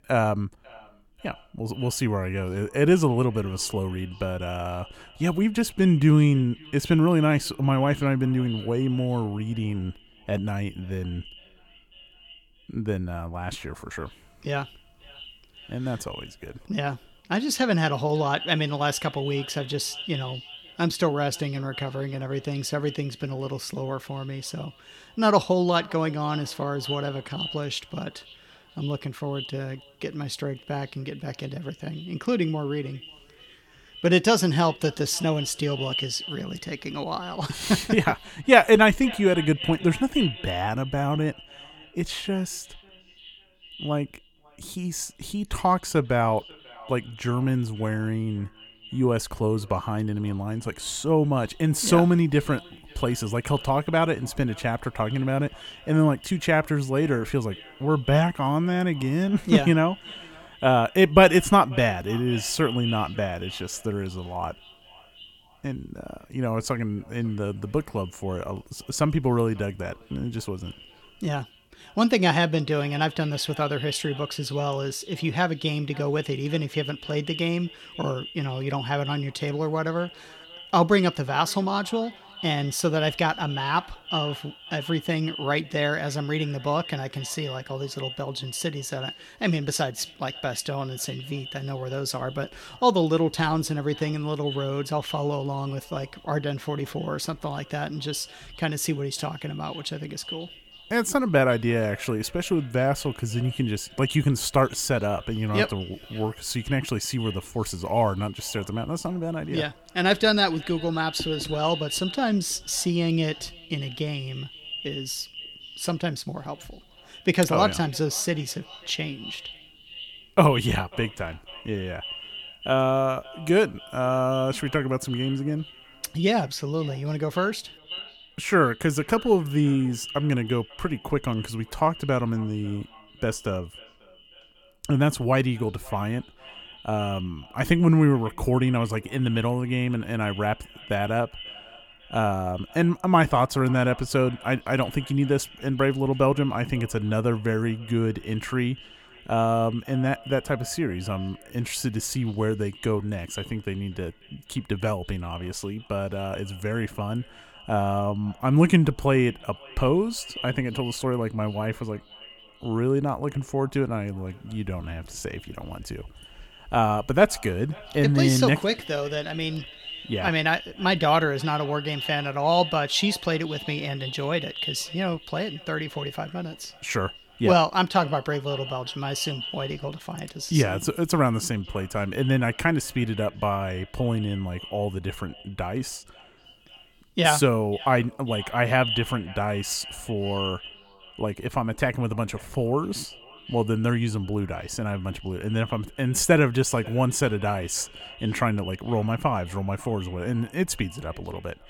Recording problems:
echo of what is said; noticeable; throughout; 540 ms later, 15 dB below the speech

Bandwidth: 17 kHz